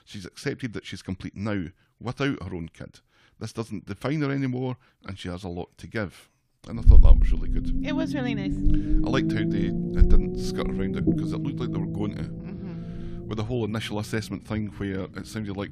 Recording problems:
low rumble; loud; from 7 s on; as loud as the speech

